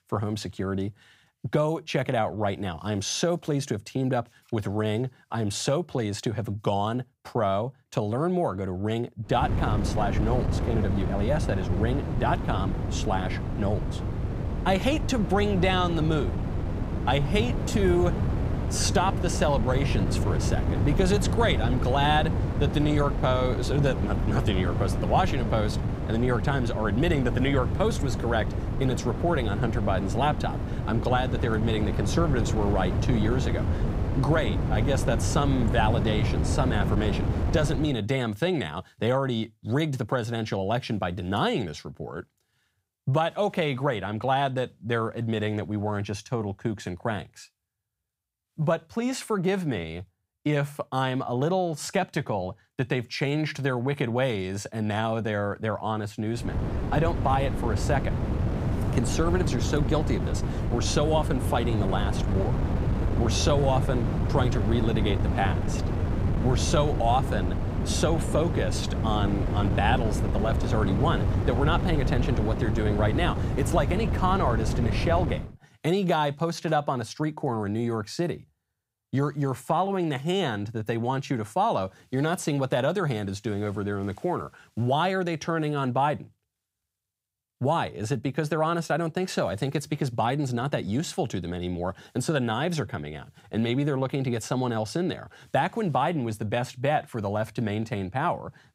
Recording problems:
wind noise on the microphone; heavy; from 9.5 to 38 s and from 56 s to 1:15; 7 dB below the speech

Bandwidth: 15.5 kHz